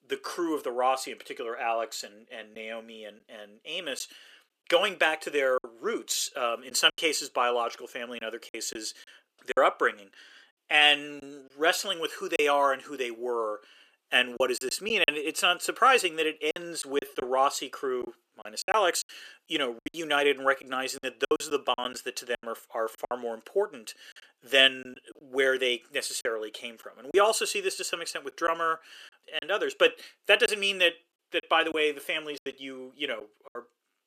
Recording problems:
thin; somewhat; fading below 350 Hz
choppy; very; 6% of the speech affected

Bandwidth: 14.5 kHz